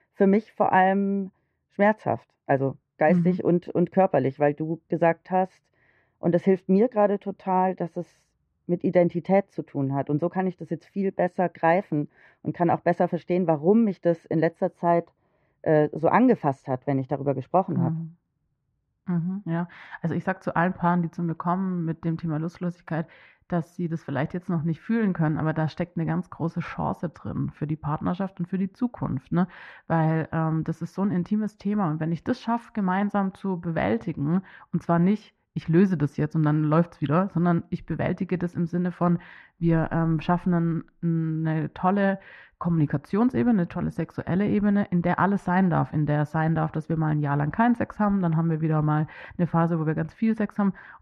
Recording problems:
muffled; very; fading above 1.5 kHz

